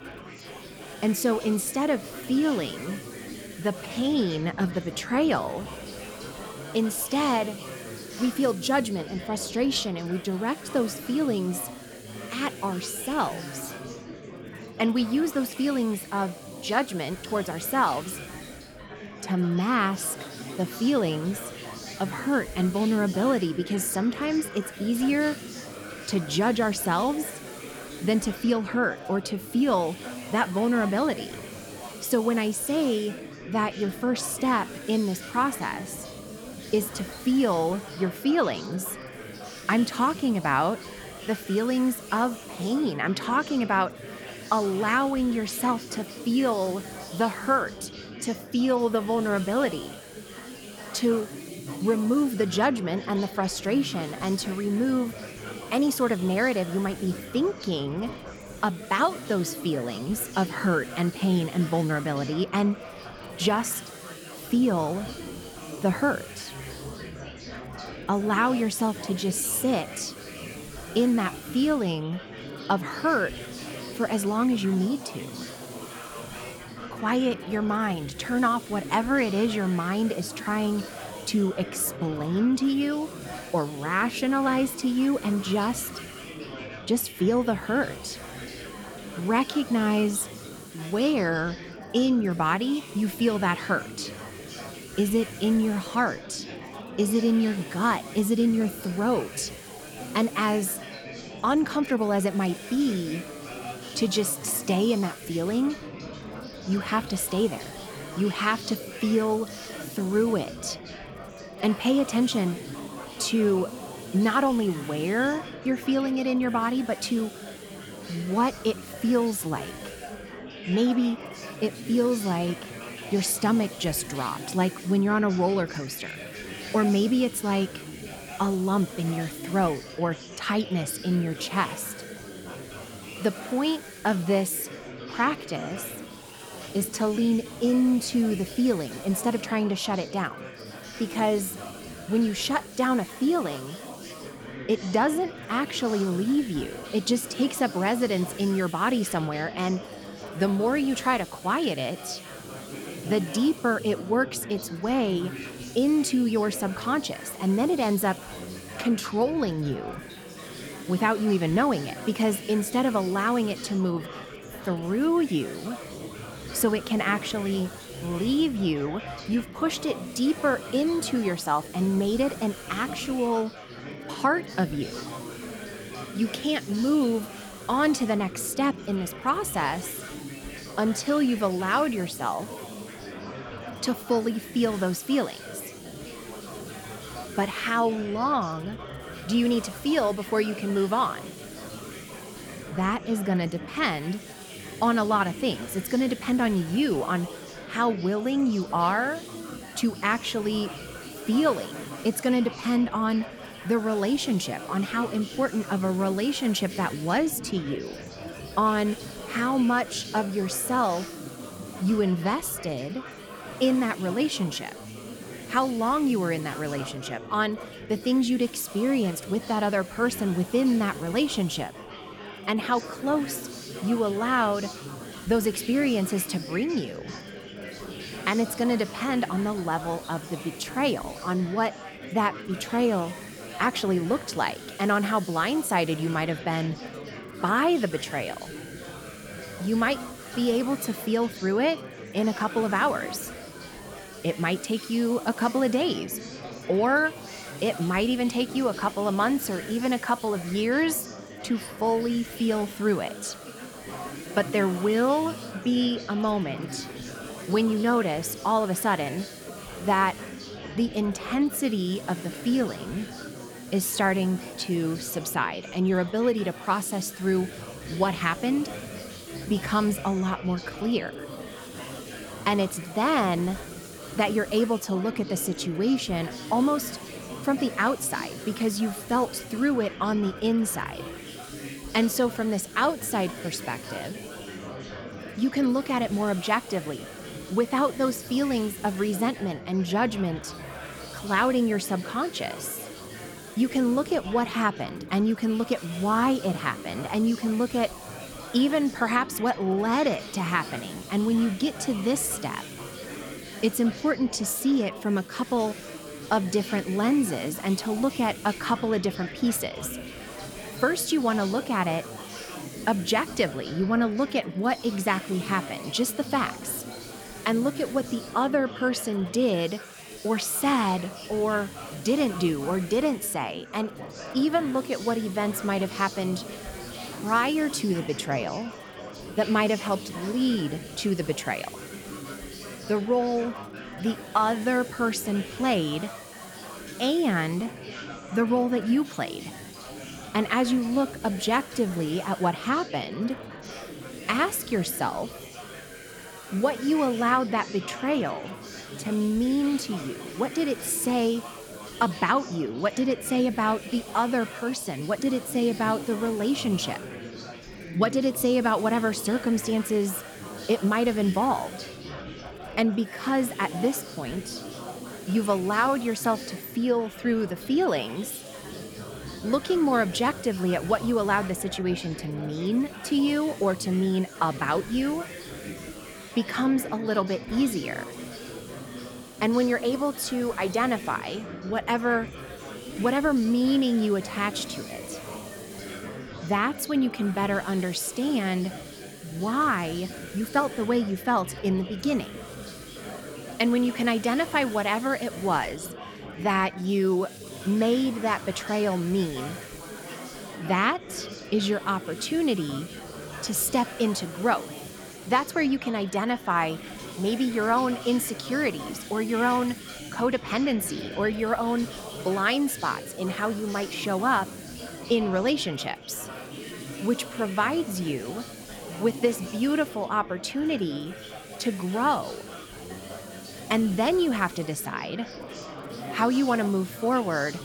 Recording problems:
chatter from many people; noticeable; throughout; 15 dB below the speech
hiss; faint; throughout; 20 dB below the speech

